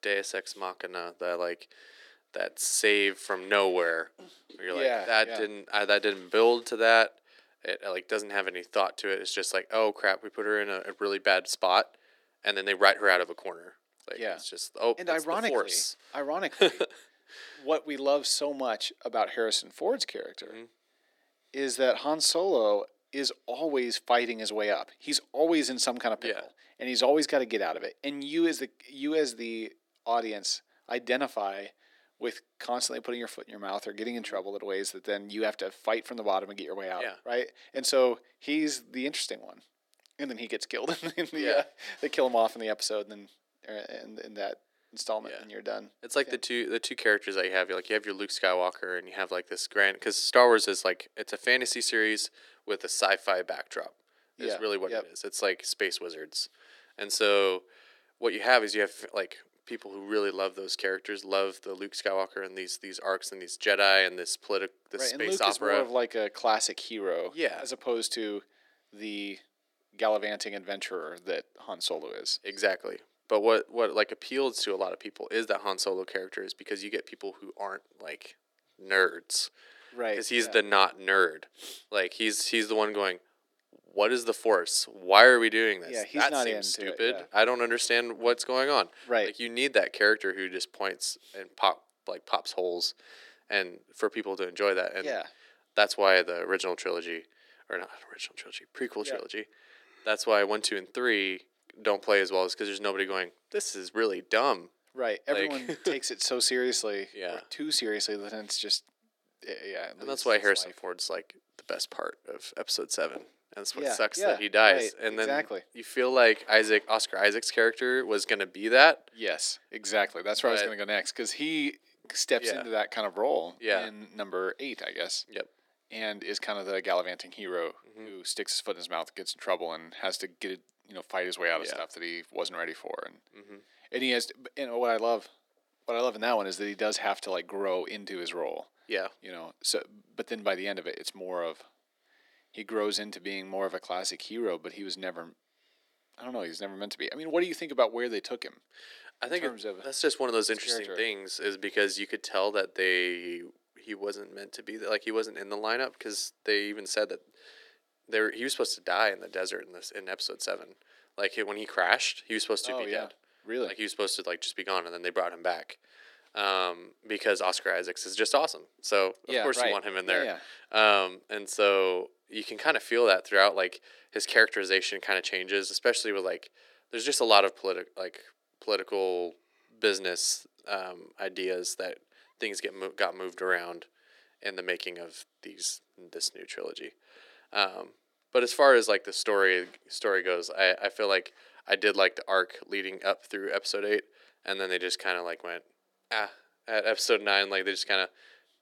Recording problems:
thin; somewhat; fading below 300 Hz

